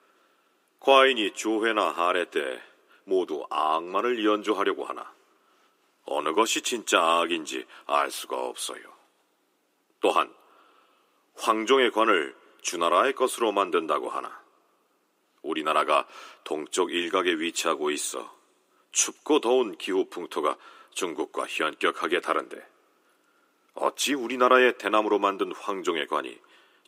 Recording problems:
thin; somewhat; fading below 300 Hz

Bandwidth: 15.5 kHz